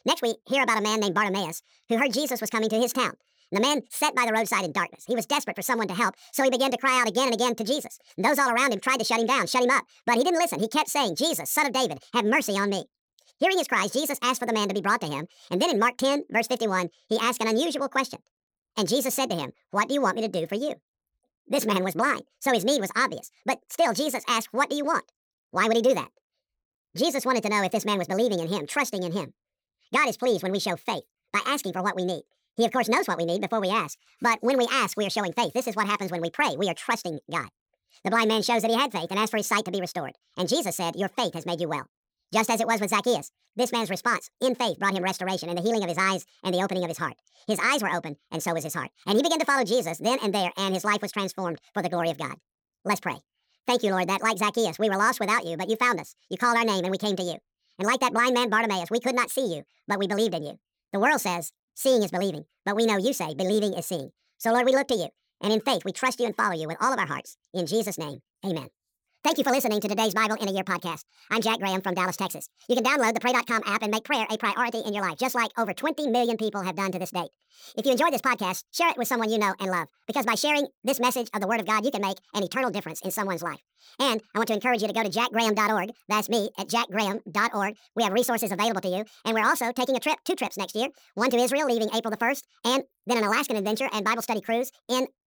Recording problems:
wrong speed and pitch; too fast and too high; 1.7 times normal speed

